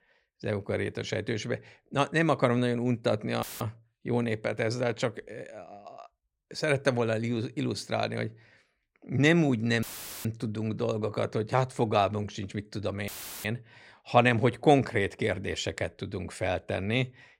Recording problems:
audio cutting out; filled with static; at 3.5 s, at 10 s and at 13 s

